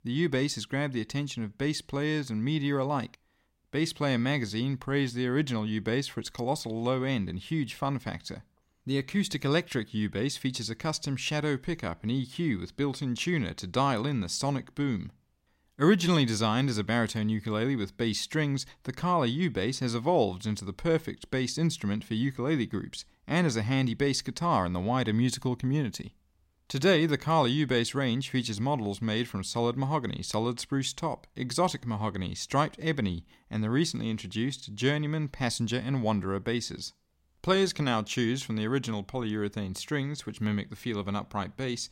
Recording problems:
none

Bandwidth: 16 kHz